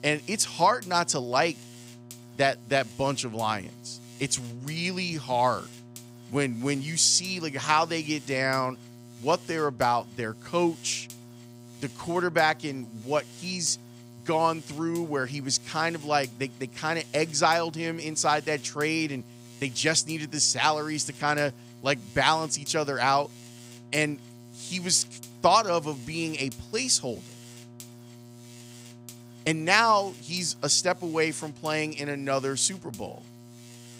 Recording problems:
electrical hum; faint; throughout; 60 Hz, 25 dB below the speech

